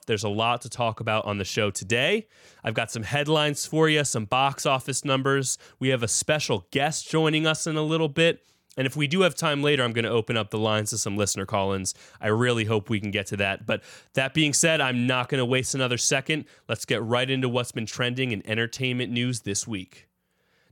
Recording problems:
none

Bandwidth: 17 kHz